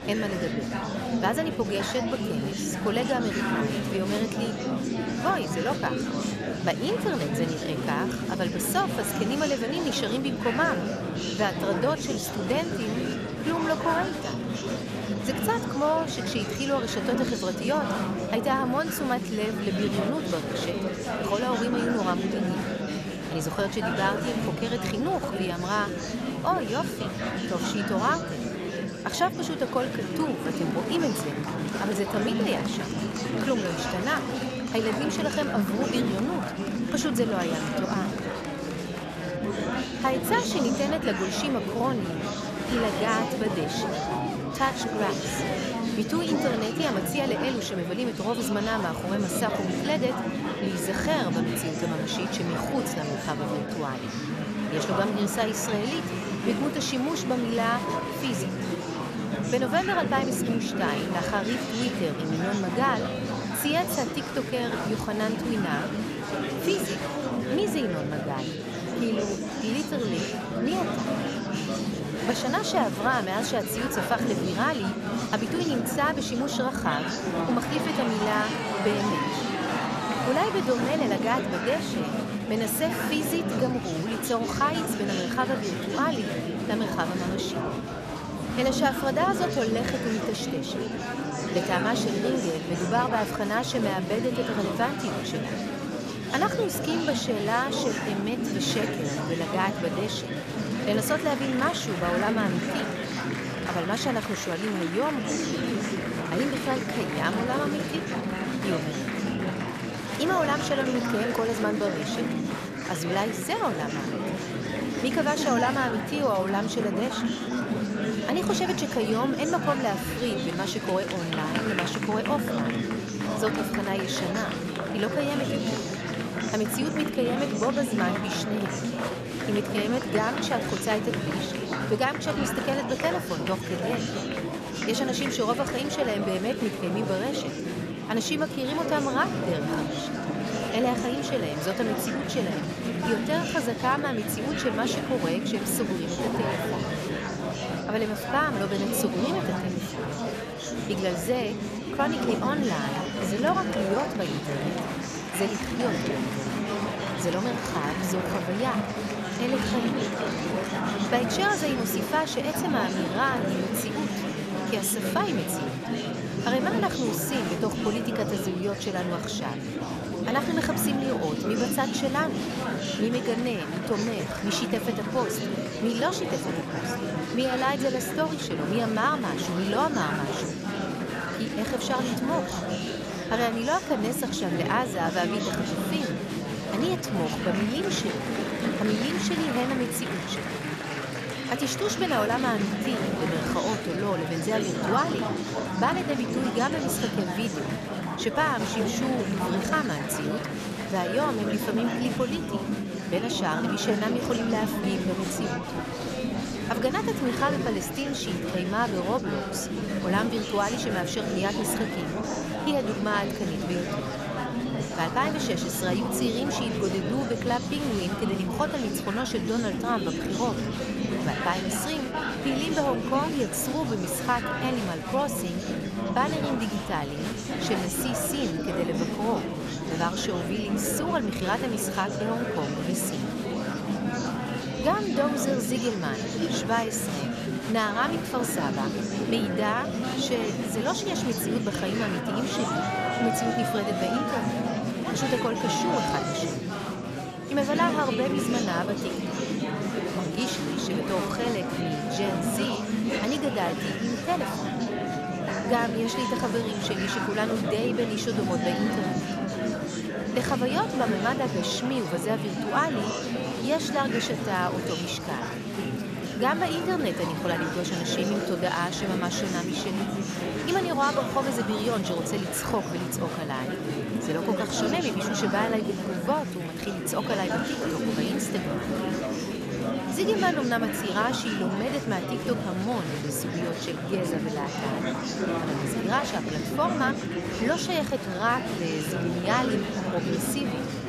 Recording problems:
murmuring crowd; loud; throughout; 1 dB below the speech

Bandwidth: 14 kHz